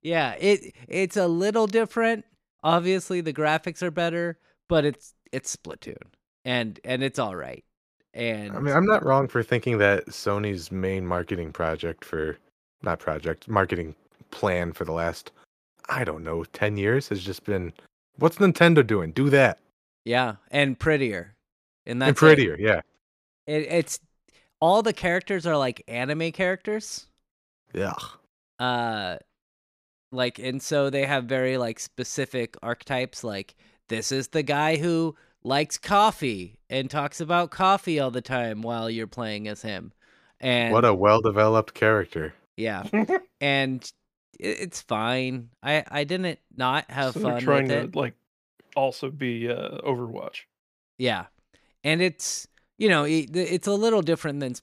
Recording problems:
none

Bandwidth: 15 kHz